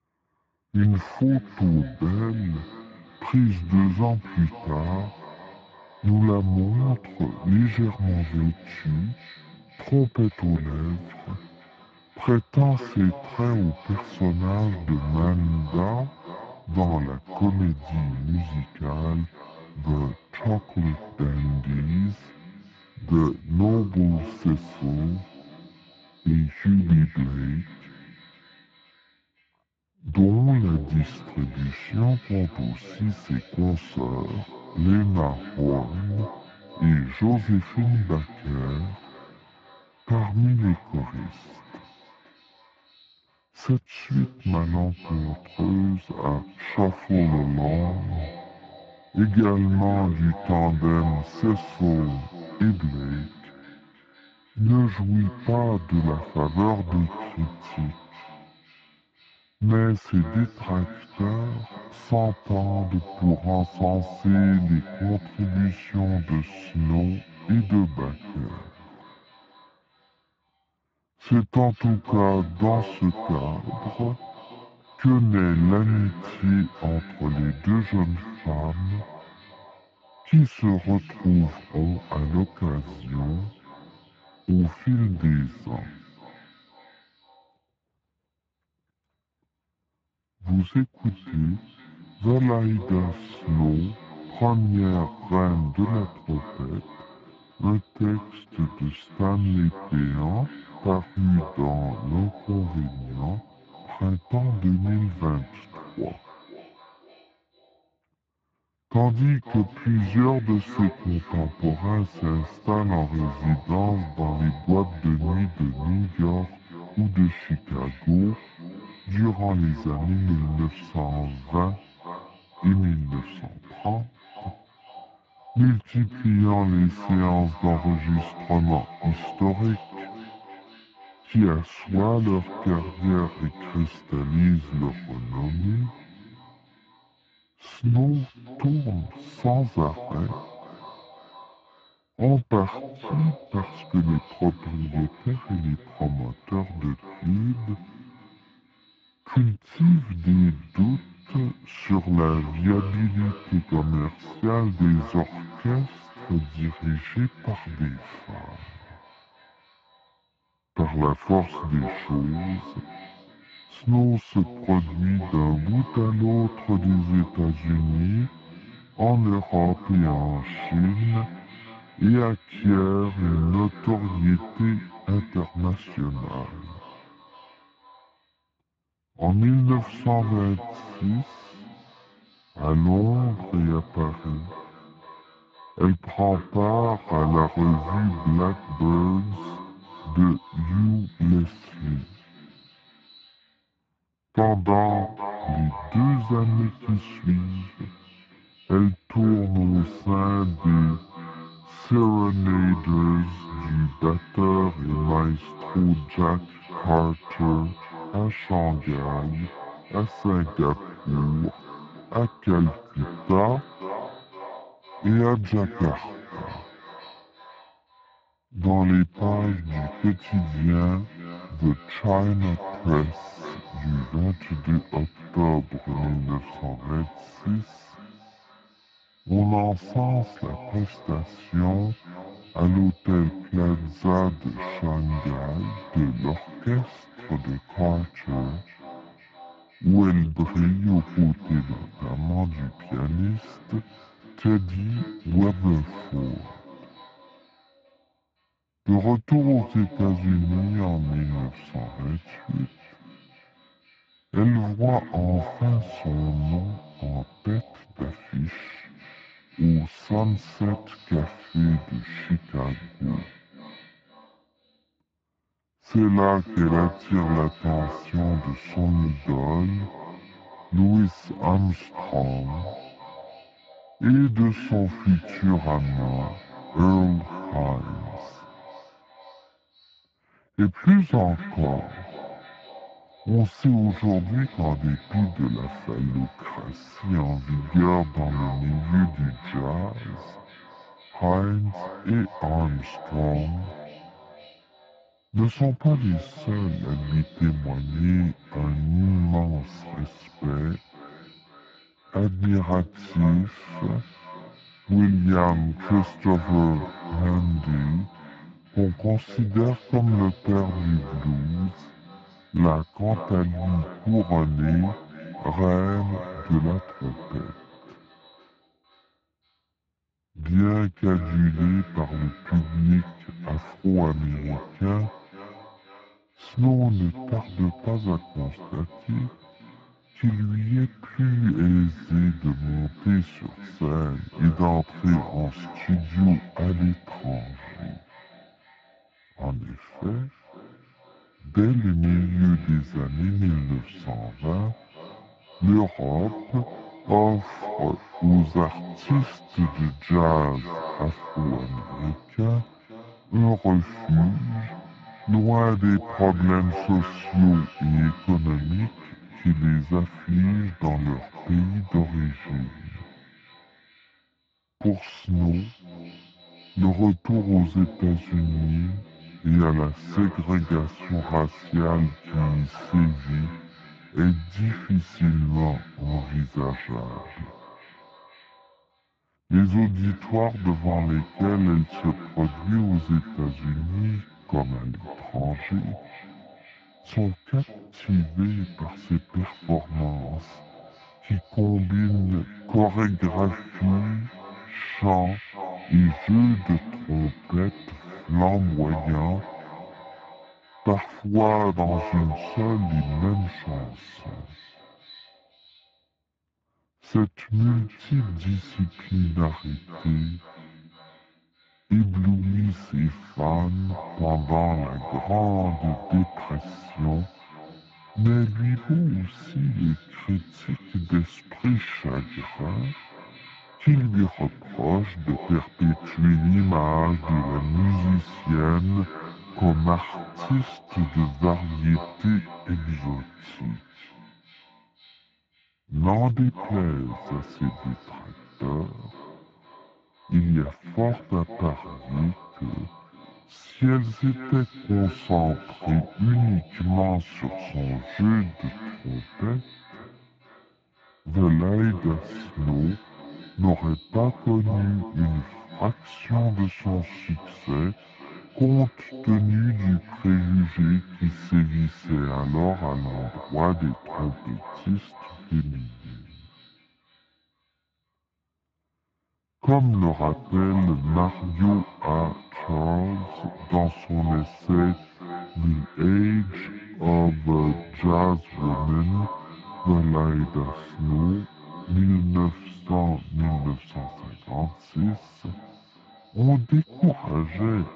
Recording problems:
garbled, watery; badly
muffled; very; fading above 2.5 kHz
wrong speed and pitch; too slow and too low; 0.6 times normal speed
echo of what is said; noticeable; throughout; 510 ms later, 15 dB below the speech

